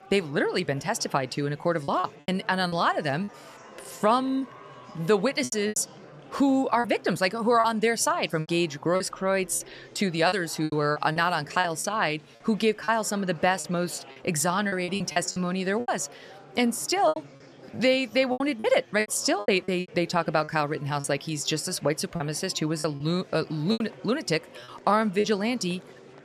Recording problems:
murmuring crowd; faint; throughout; 20 dB below the speech
choppy; very; 10% of the speech affected

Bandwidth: 14 kHz